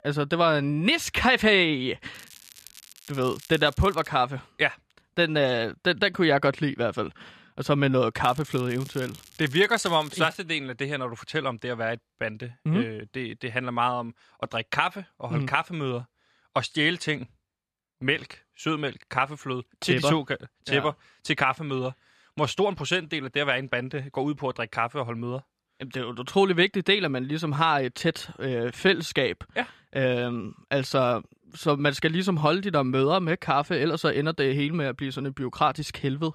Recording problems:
crackling; faint; from 2 to 4 s and from 8 to 10 s; 20 dB below the speech

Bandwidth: 14 kHz